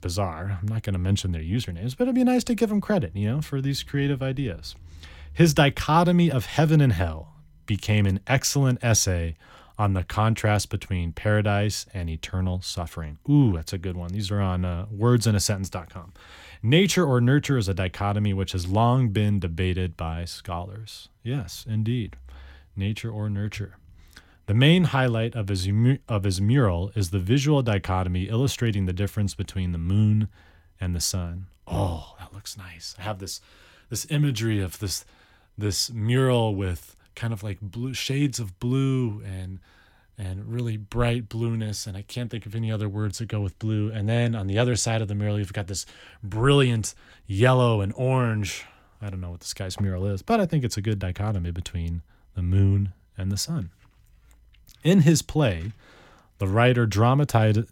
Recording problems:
none

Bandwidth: 16.5 kHz